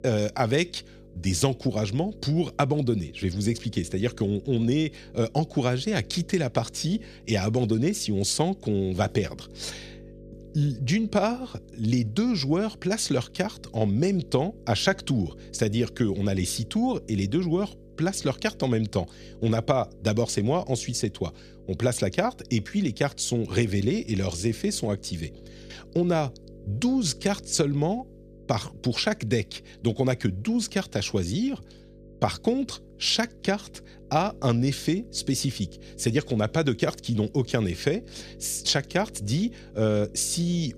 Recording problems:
electrical hum; faint; throughout; 50 Hz, 25 dB below the speech

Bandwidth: 14 kHz